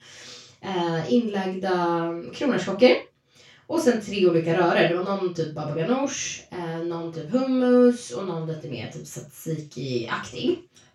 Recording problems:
off-mic speech; far
room echo; noticeable; dies away in 0.2 s

